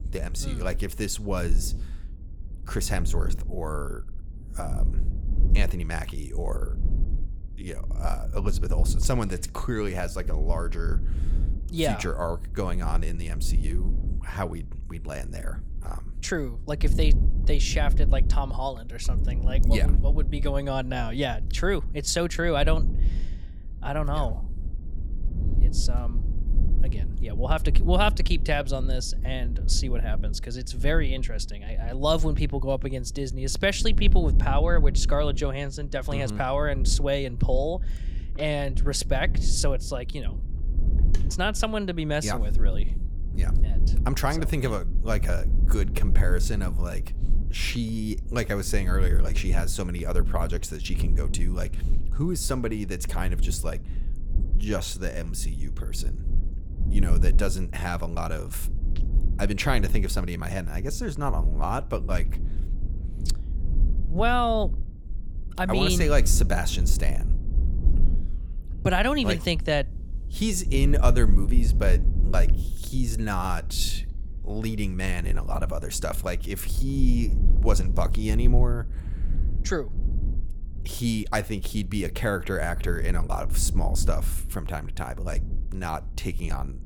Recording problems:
low rumble; noticeable; throughout; 15 dB below the speech

